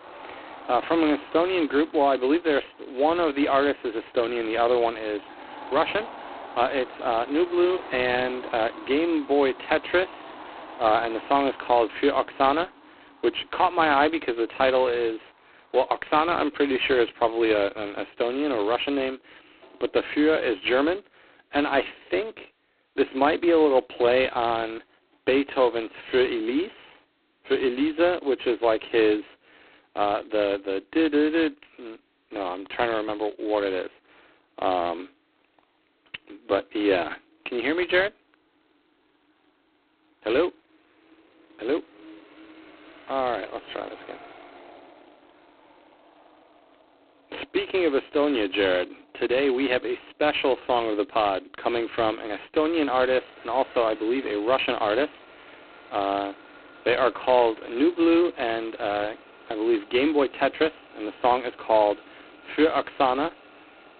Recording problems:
phone-call audio; poor line; nothing above 4 kHz
traffic noise; faint; throughout; 20 dB below the speech

